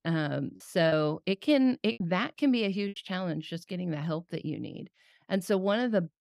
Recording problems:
choppy; occasionally; from 1 to 3 s; 4% of the speech affected

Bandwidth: 15.5 kHz